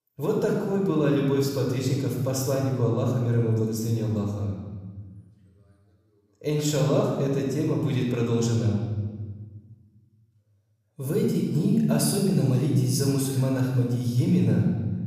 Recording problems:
room echo; noticeable; dies away in 1.4 s
off-mic speech; somewhat distant

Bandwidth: 15 kHz